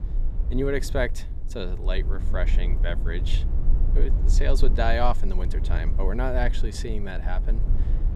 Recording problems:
low rumble; noticeable; throughout; 15 dB below the speech

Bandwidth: 14 kHz